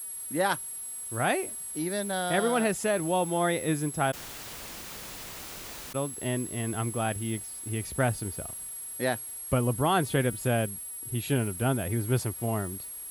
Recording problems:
high-pitched whine; loud; throughout; 11 kHz, 7 dB below the speech
hiss; faint; throughout; 25 dB below the speech
audio cutting out; at 4 s for 2 s

